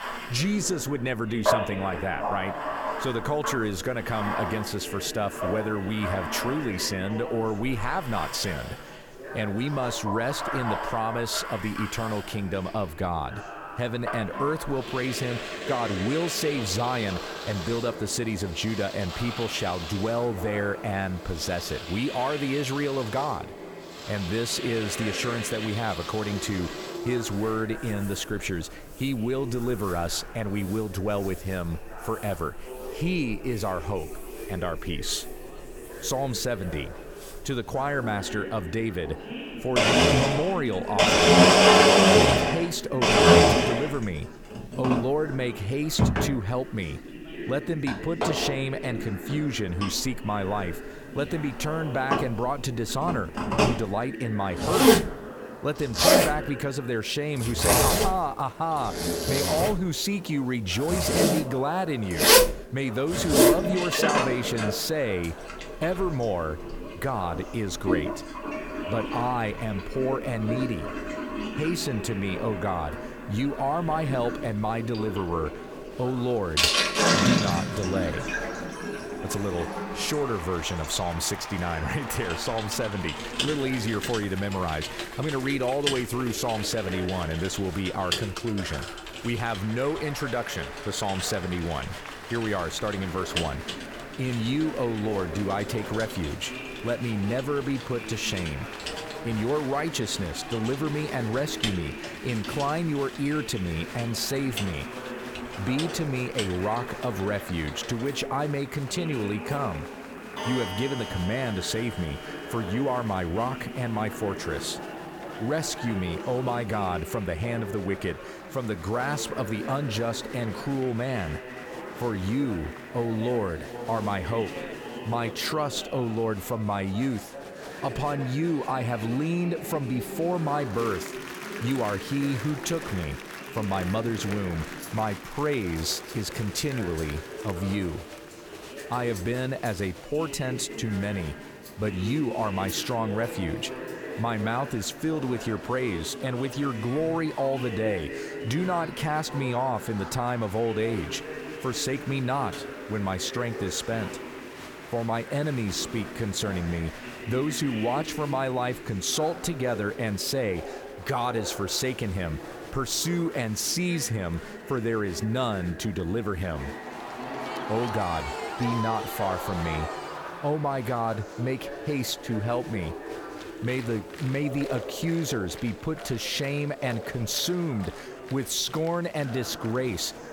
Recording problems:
household noises; very loud; throughout; 3 dB above the speech
chatter from many people; loud; throughout; 9 dB below the speech
hiss; faint; throughout; 25 dB below the speech

